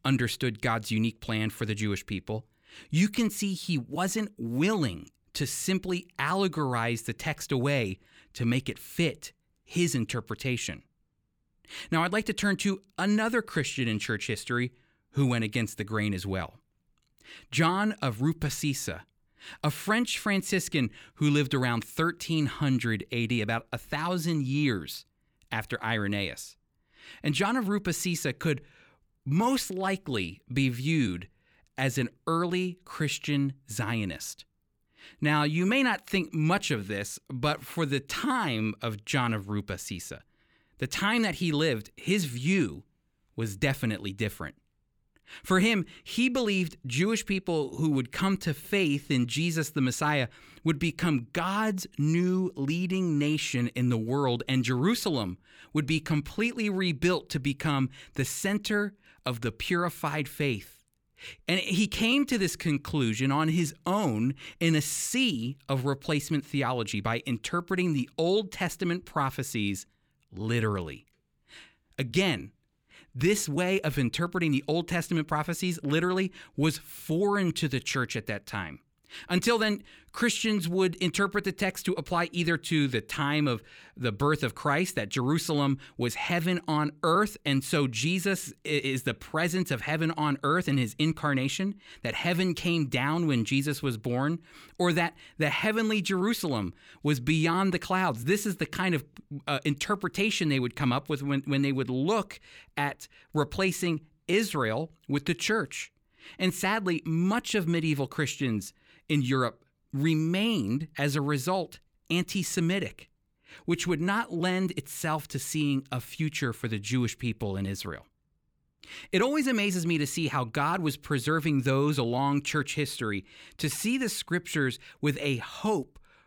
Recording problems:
none

